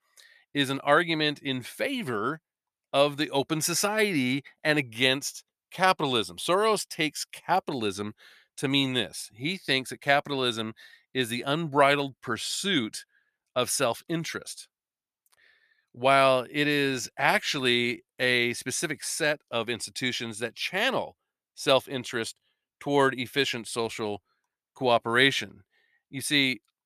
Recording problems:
none

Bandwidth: 14.5 kHz